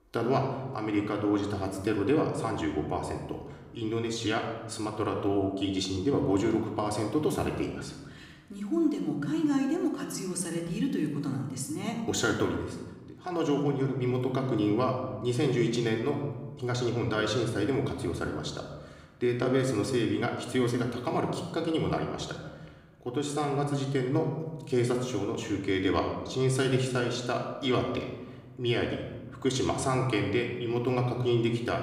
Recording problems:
room echo; slight; dies away in 1 s
off-mic speech; somewhat distant

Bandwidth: 15.5 kHz